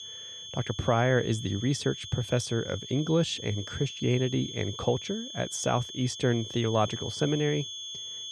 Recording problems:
high-pitched whine; loud; throughout; 3.5 kHz, 9 dB below the speech

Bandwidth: 14.5 kHz